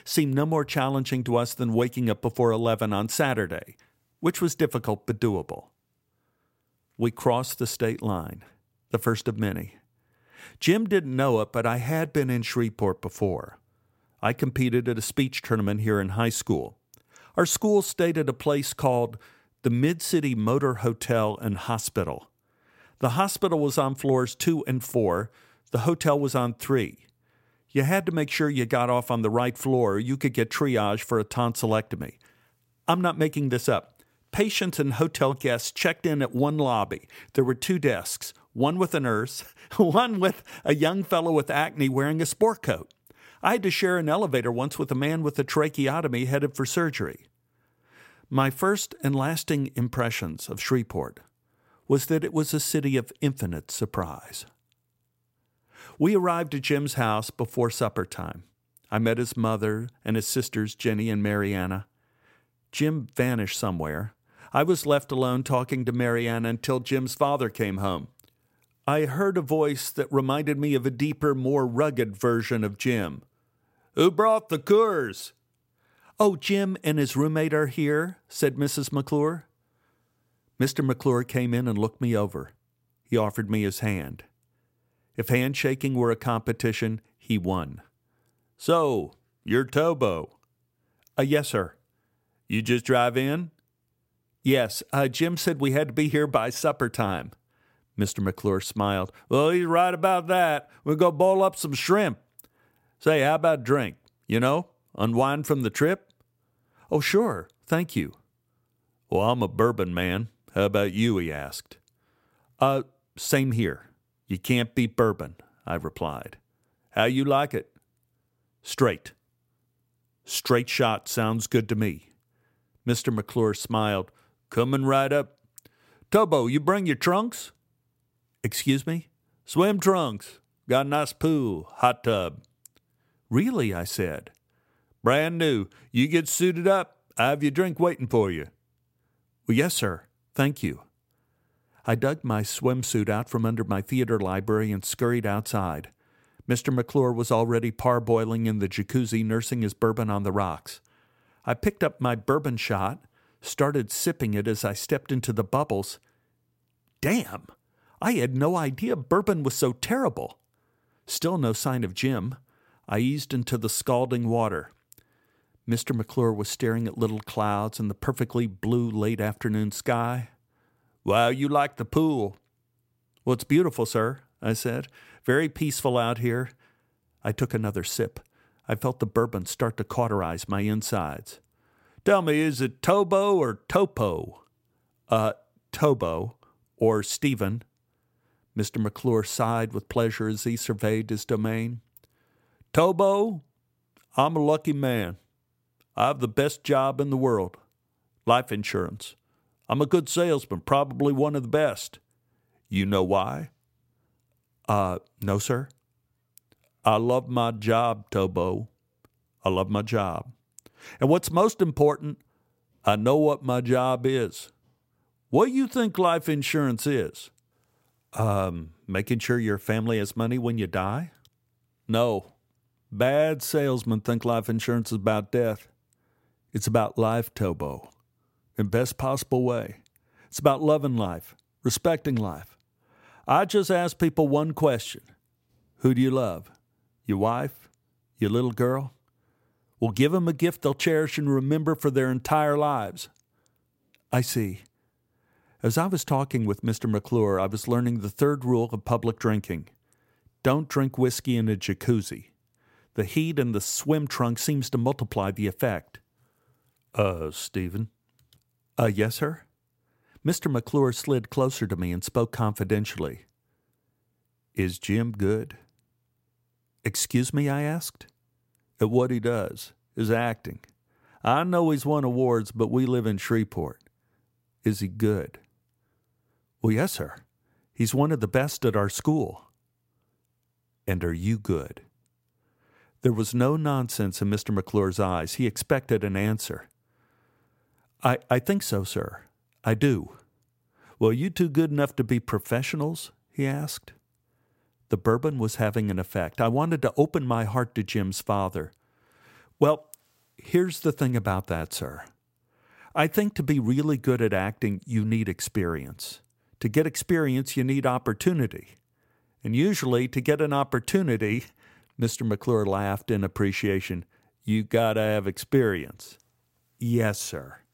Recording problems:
none

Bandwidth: 16 kHz